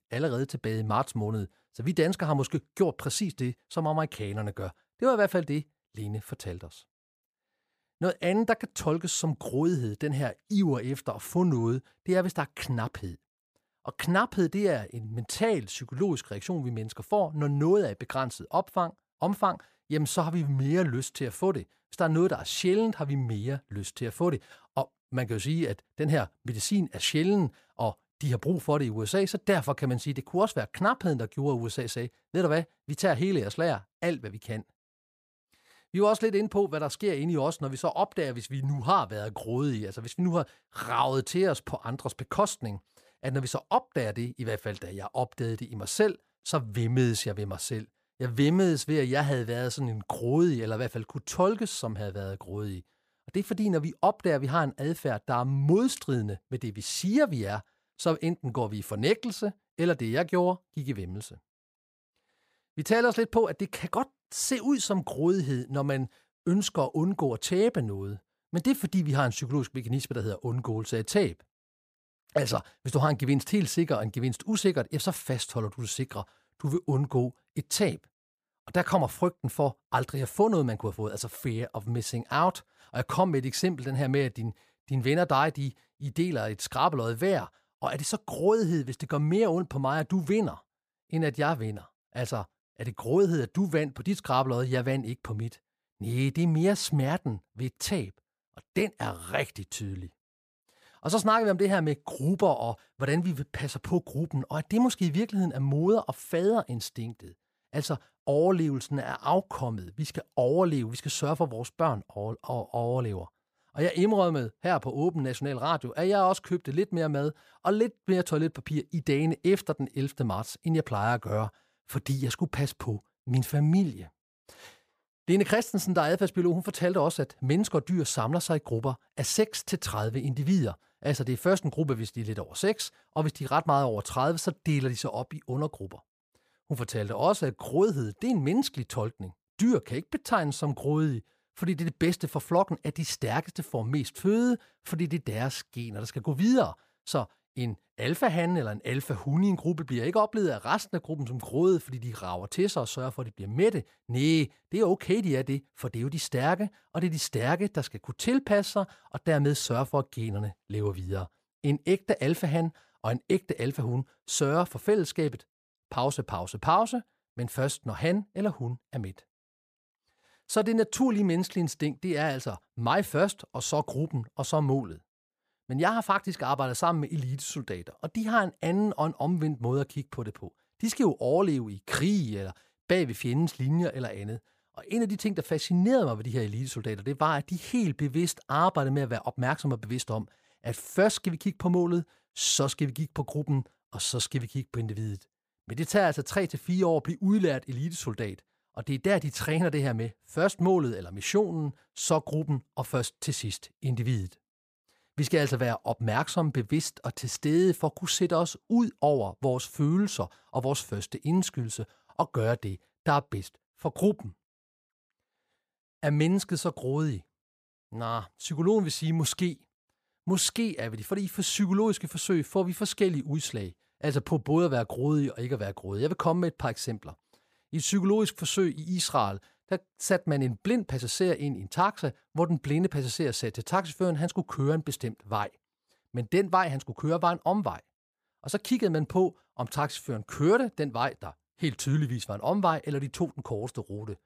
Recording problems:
none

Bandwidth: 15 kHz